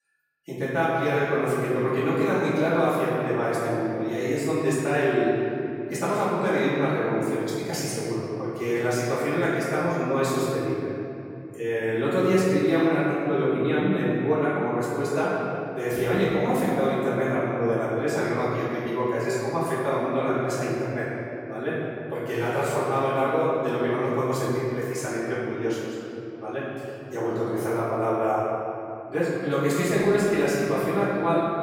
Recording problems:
room echo; strong; dies away in 2.9 s
off-mic speech; far

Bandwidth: 16.5 kHz